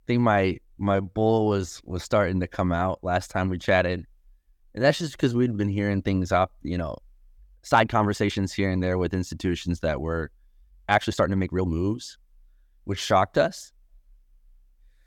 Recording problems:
uneven, jittery; strongly; from 0.5 to 12 s

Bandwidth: 18 kHz